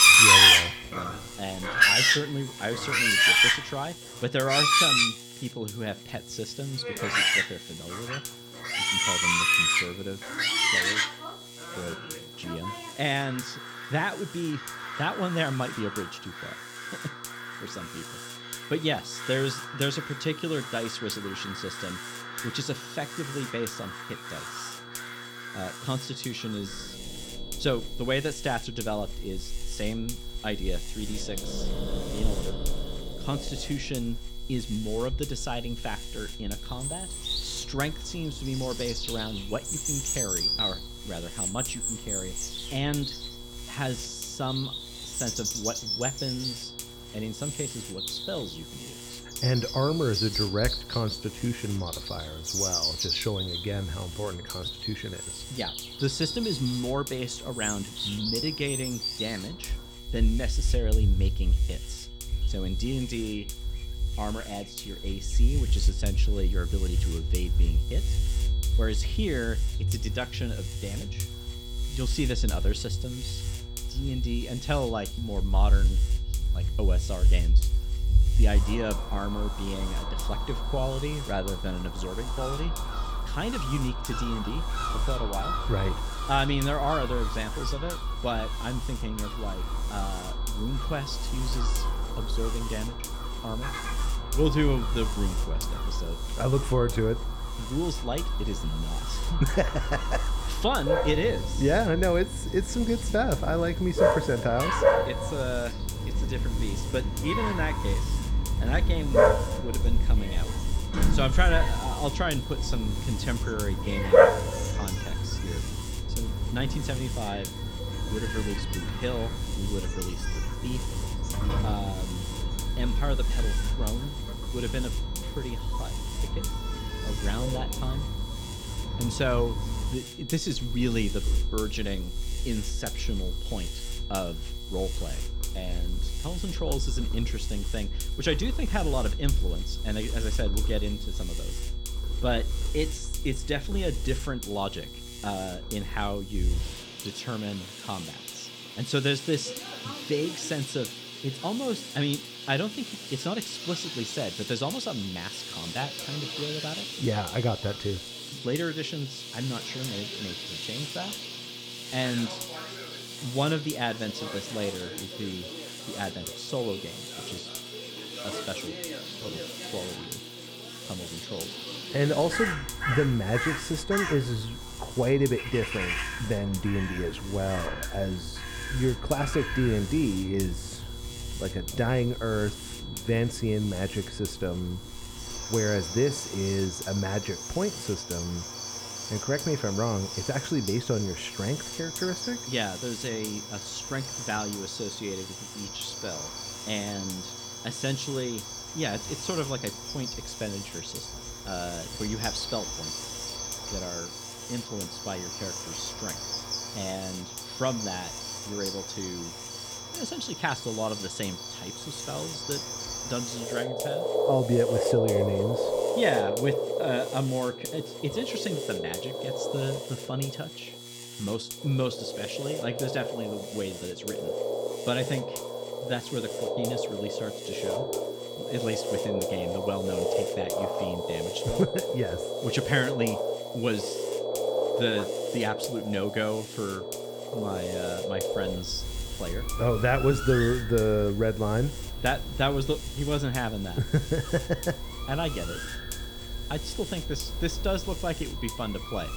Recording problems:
animal sounds; very loud; throughout; 2 dB above the speech
electrical hum; noticeable; throughout; 60 Hz, 10 dB below the speech
high-pitched whine; noticeable; throughout; 3.5 kHz, 15 dB below the speech

